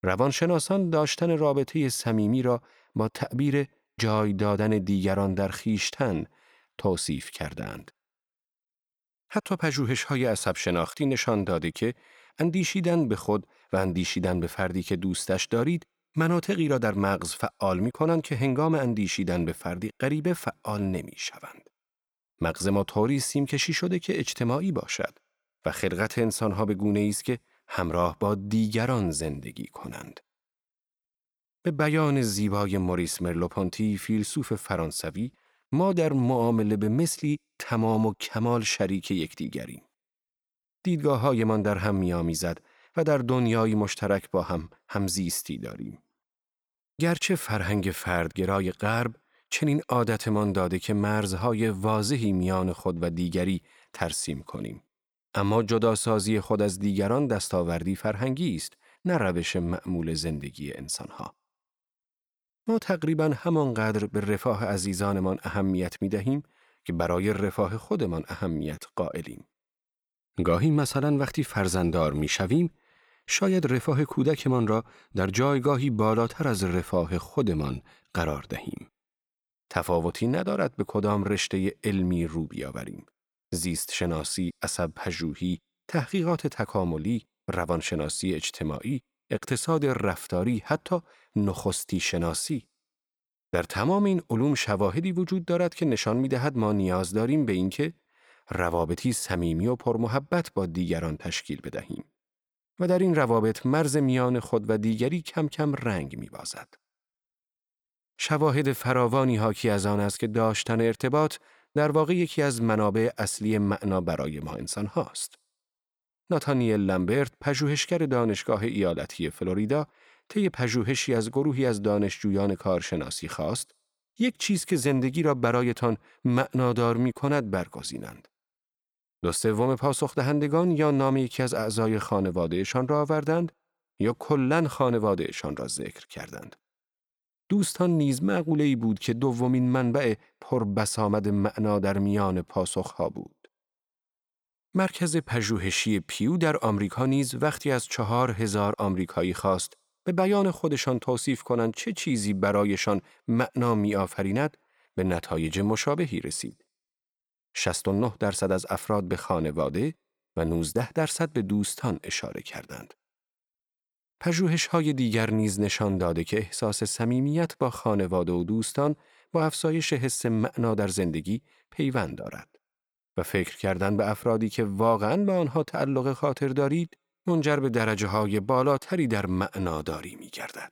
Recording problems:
none

